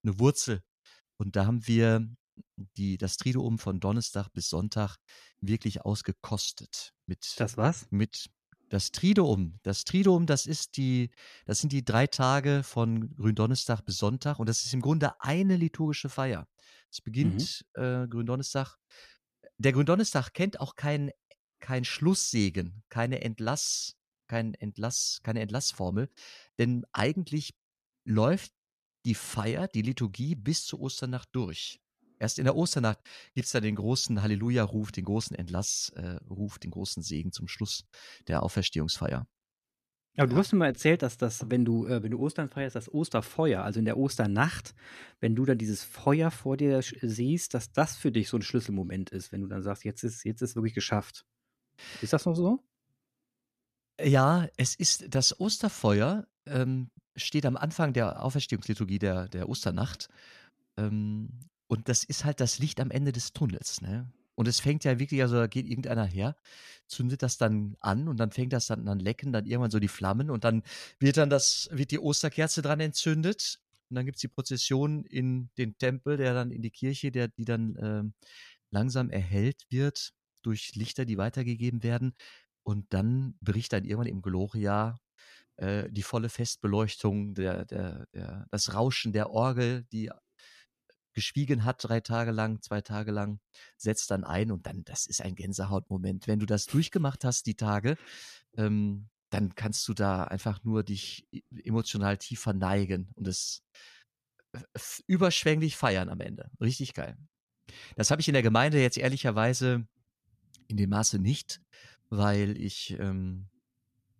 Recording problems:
none

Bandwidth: 14.5 kHz